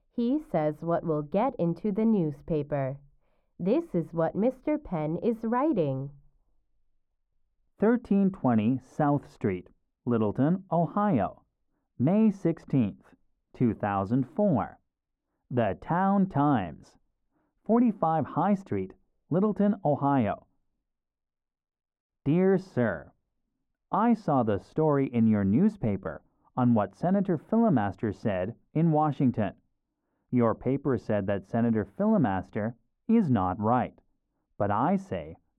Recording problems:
muffled; very; fading above 2 kHz

